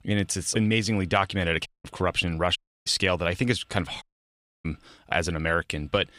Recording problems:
audio cutting out; at 1.5 s, at 2.5 s and at 4 s for 0.5 s

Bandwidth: 15 kHz